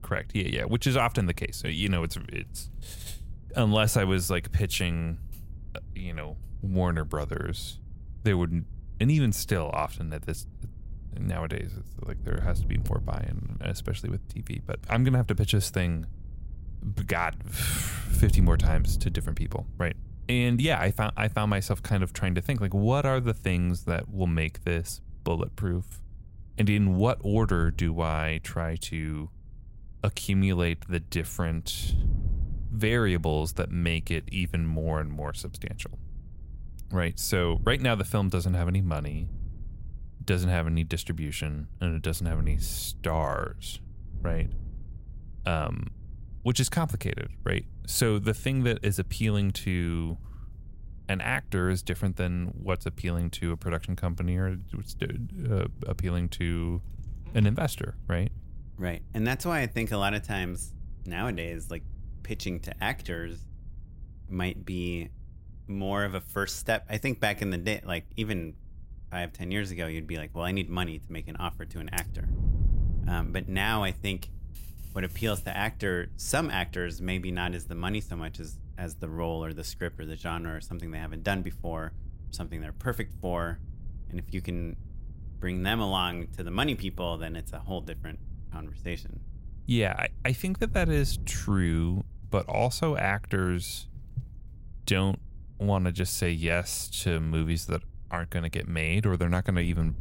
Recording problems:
wind noise on the microphone; occasional gusts; 25 dB below the speech

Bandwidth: 16 kHz